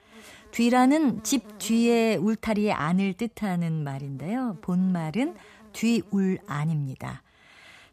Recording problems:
animal sounds; faint; throughout; 25 dB below the speech

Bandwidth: 14.5 kHz